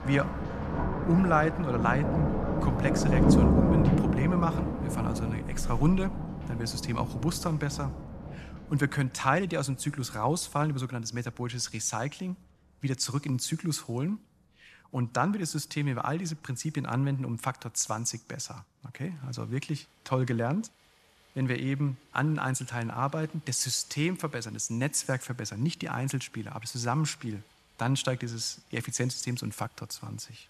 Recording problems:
rain or running water; very loud; throughout; 2 dB above the speech

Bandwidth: 13.5 kHz